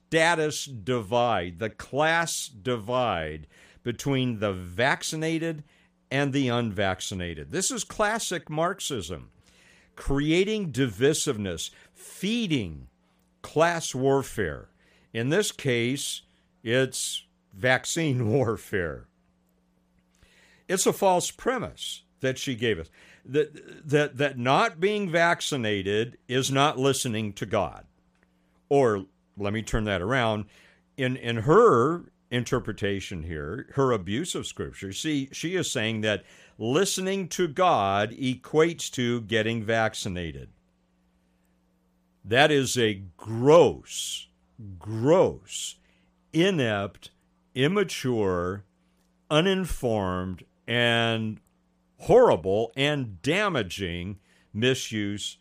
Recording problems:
none

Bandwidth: 15 kHz